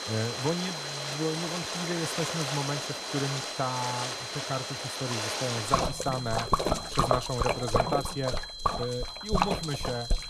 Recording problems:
rain or running water; very loud; throughout; 2 dB above the speech
high-pitched whine; loud; throughout; 4 kHz, 5 dB below the speech

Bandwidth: 14 kHz